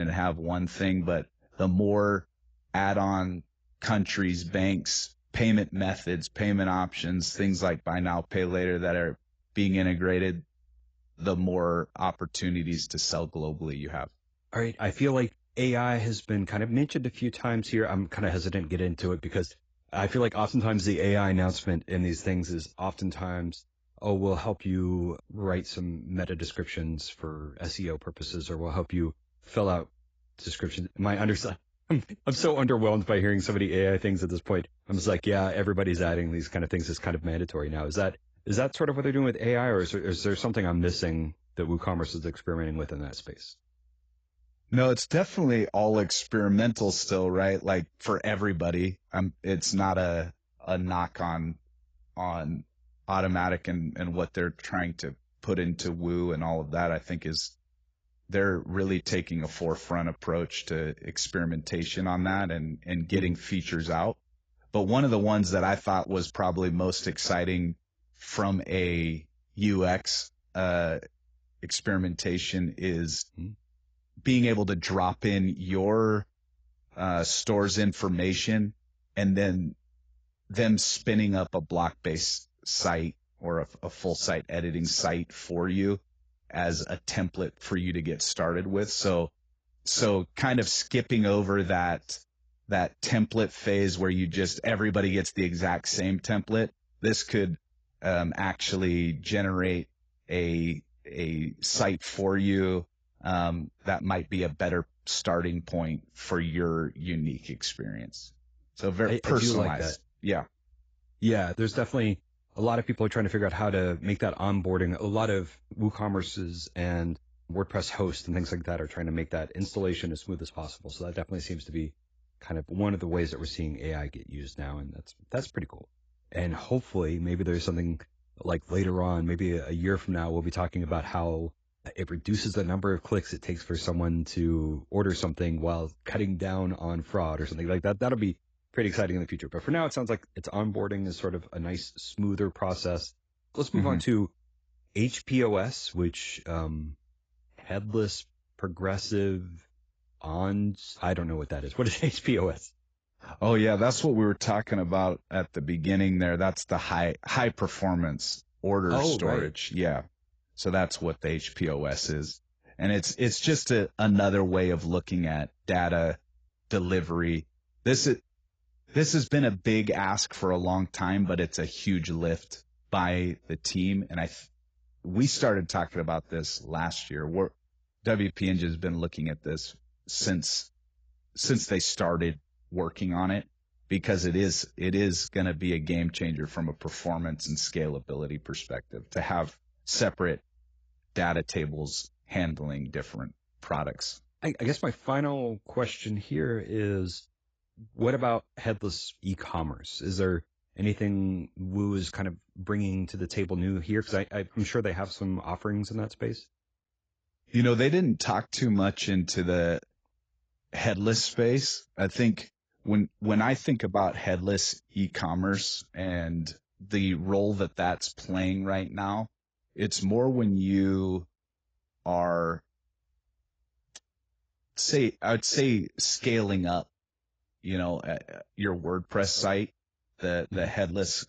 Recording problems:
garbled, watery; badly; nothing above 7.5 kHz
abrupt cut into speech; at the start

